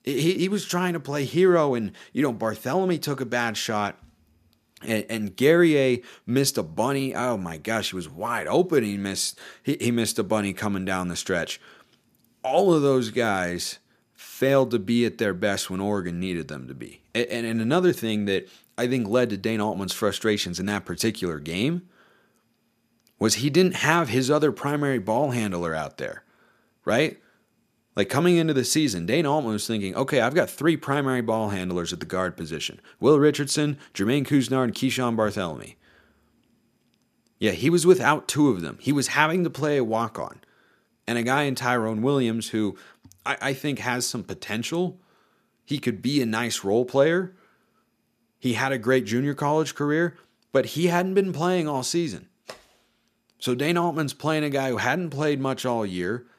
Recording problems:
none

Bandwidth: 14.5 kHz